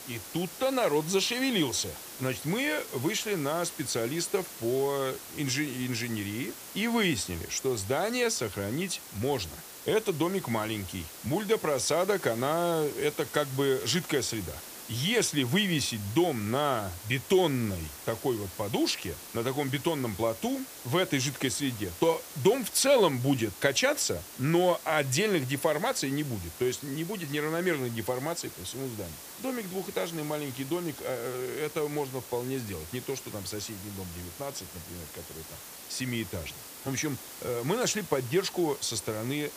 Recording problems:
hiss; noticeable; throughout; 10 dB below the speech

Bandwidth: 15 kHz